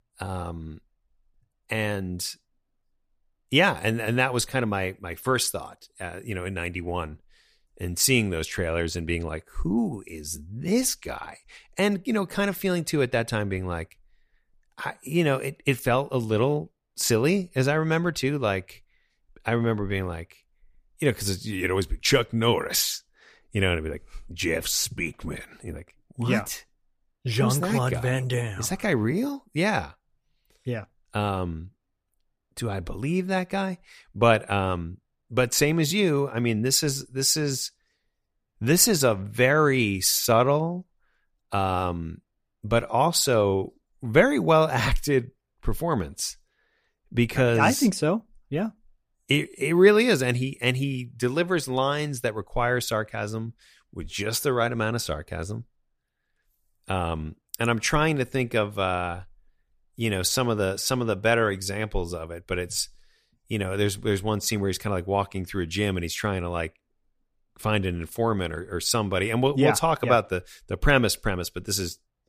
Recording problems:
none

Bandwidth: 15 kHz